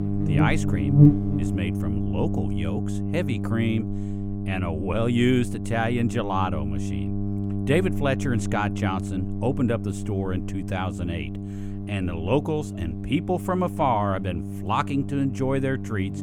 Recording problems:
electrical hum; loud; throughout; 50 Hz, 7 dB below the speech

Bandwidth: 17.5 kHz